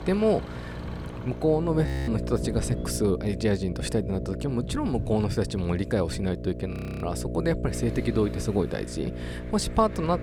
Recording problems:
electrical hum; noticeable; throughout; 60 Hz, 10 dB below the speech
traffic noise; noticeable; throughout; 20 dB below the speech
wind noise on the microphone; occasional gusts; 20 dB below the speech
audio freezing; at 2 s and at 6.5 s

